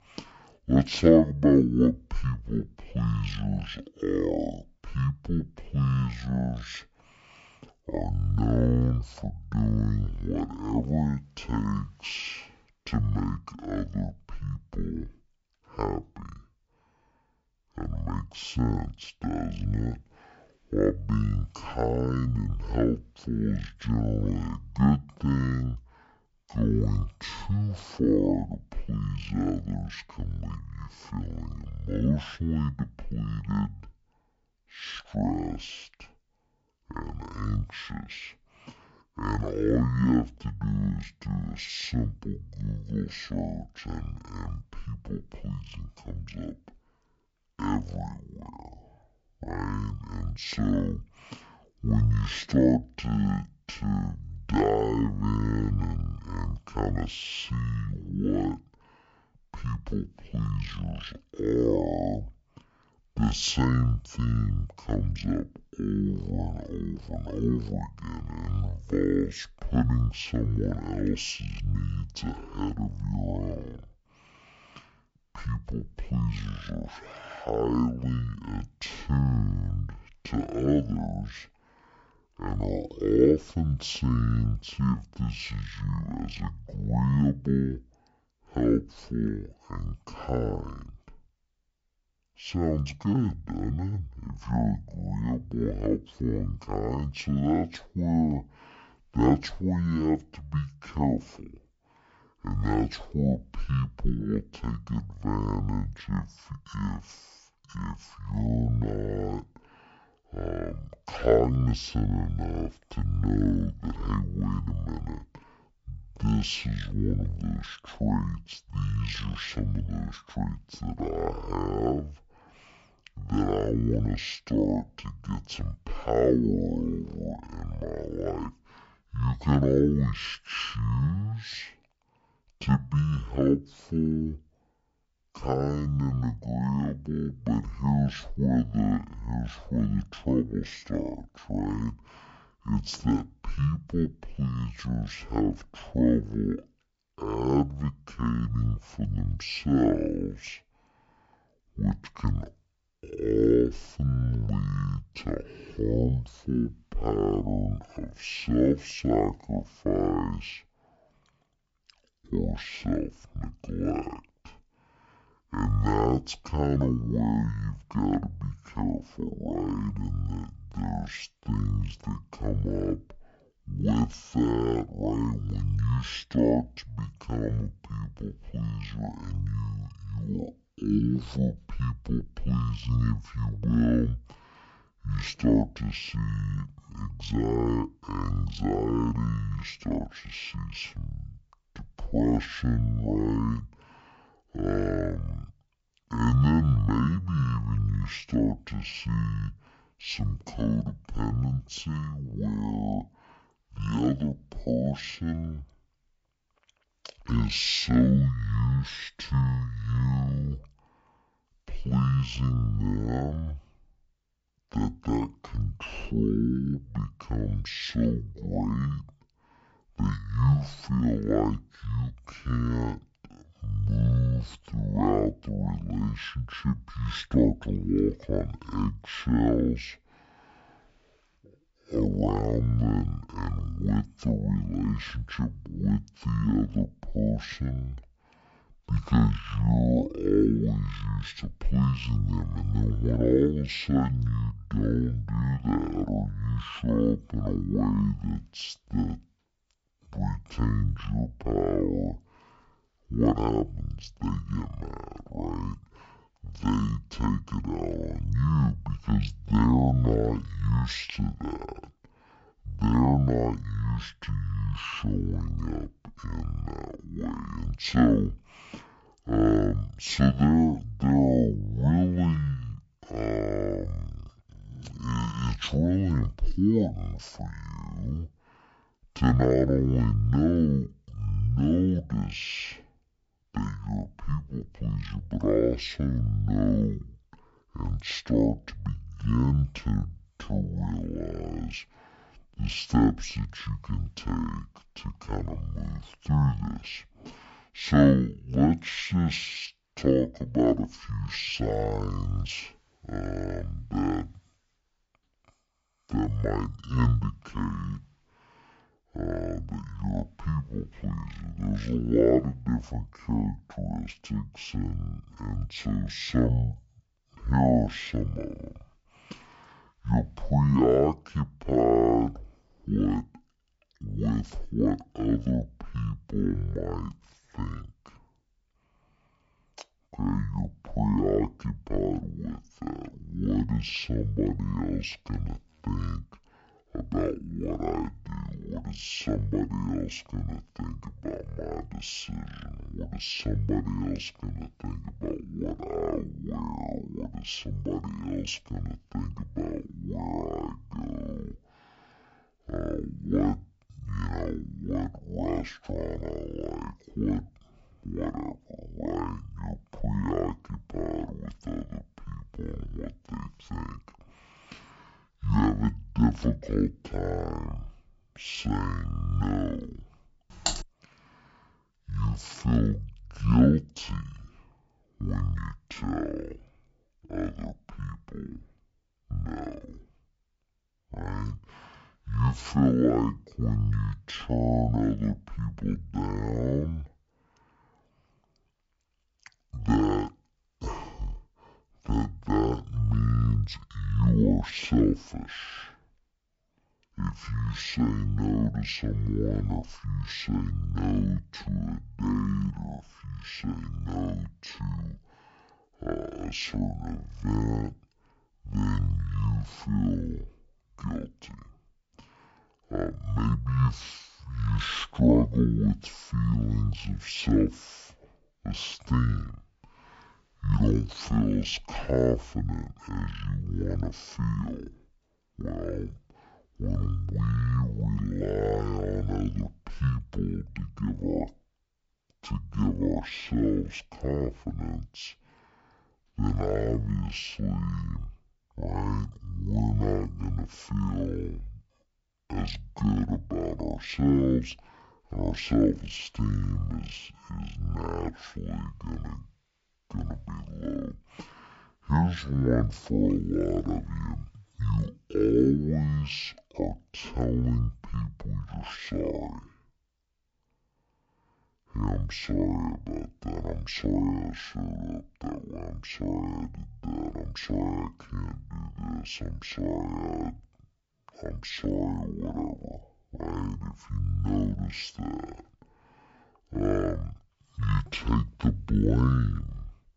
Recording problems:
wrong speed and pitch; too slow and too low; 0.5 times normal speed
keyboard typing; noticeable; at 6:11; peak 1 dB below the speech

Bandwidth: 7.5 kHz